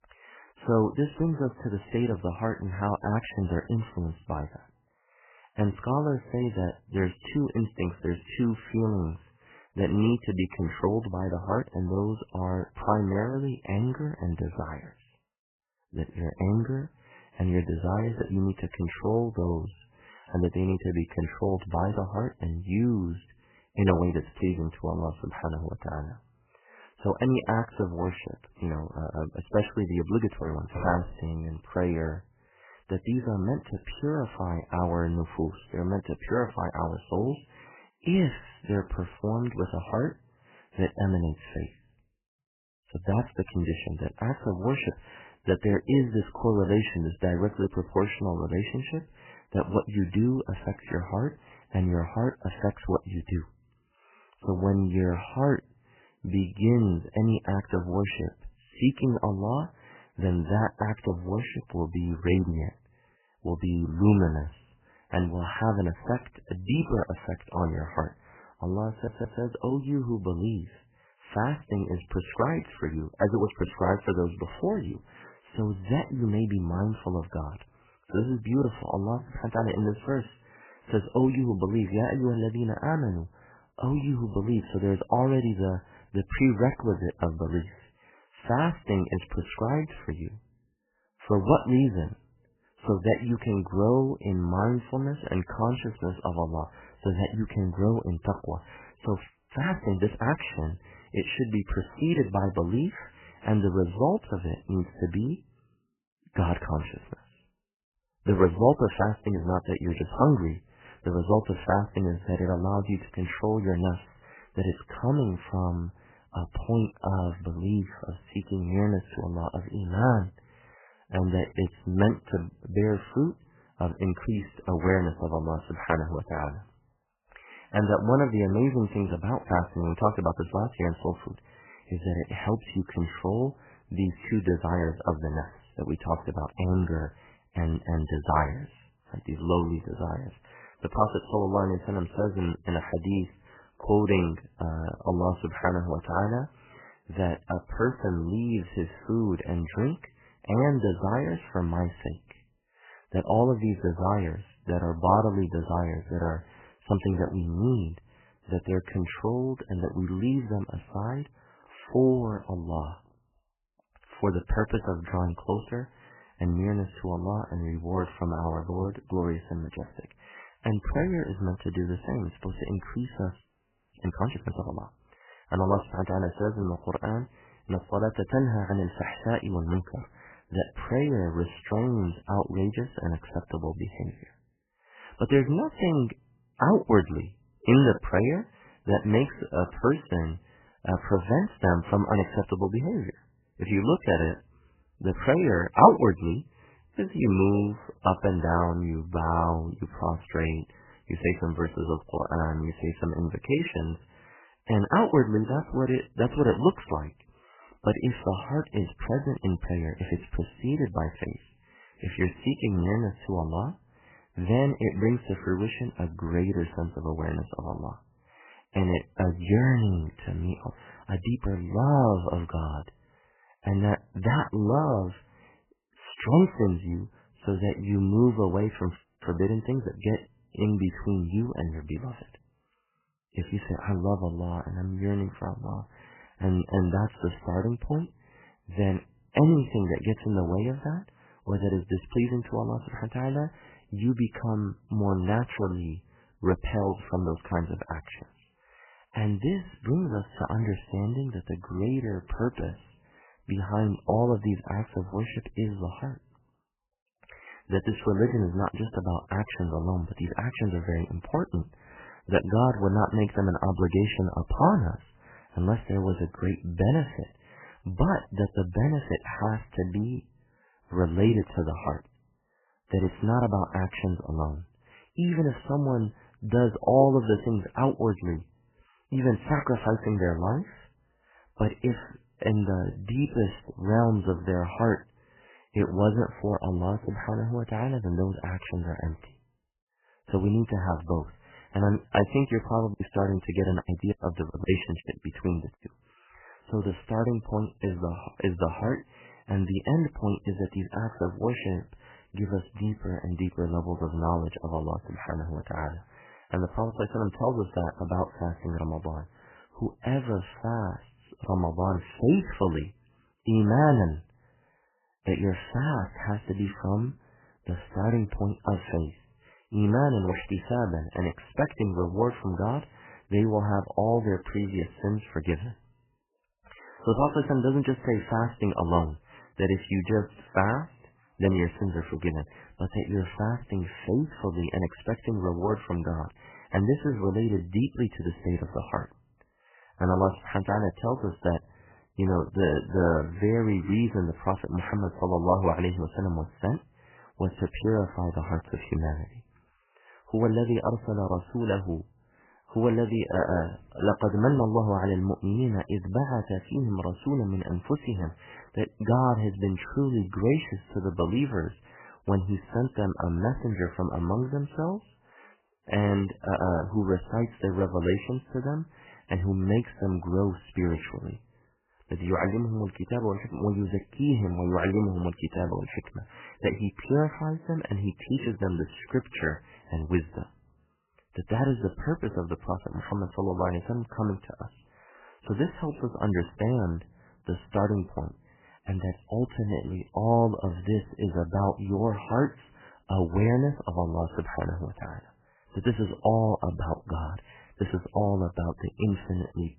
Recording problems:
garbled, watery; badly; nothing above 3 kHz
audio stuttering; at 1:09
audio freezing; at 1:39, at 2:53 for 0.5 s and at 3:49
choppy; very; from 4:53 to 4:56; 16% of the speech affected

